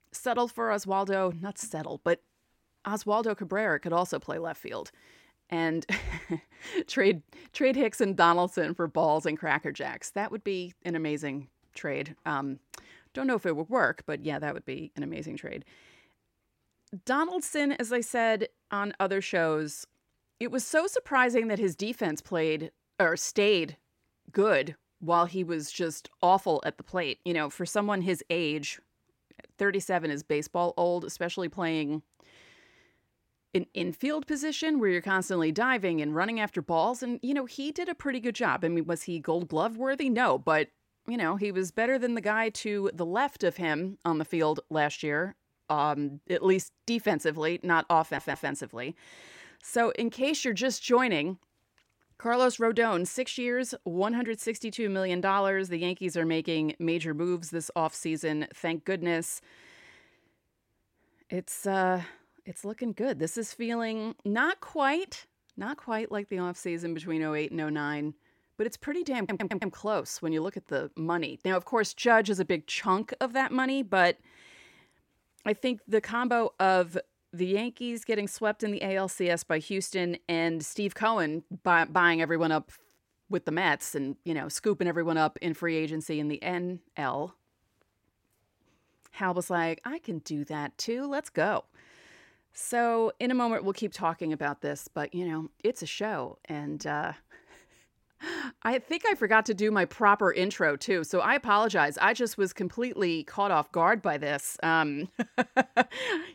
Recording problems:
audio stuttering; at 48 s and at 1:09

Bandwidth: 16.5 kHz